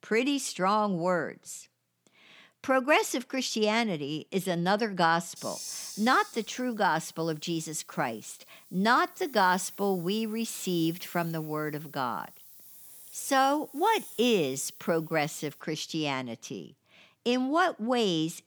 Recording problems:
hiss; noticeable; from 5.5 to 16 s; 15 dB below the speech

